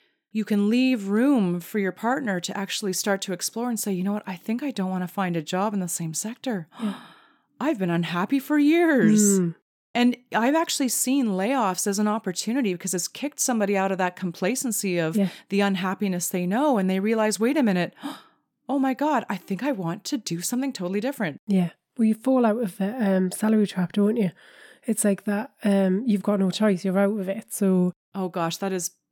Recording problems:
none

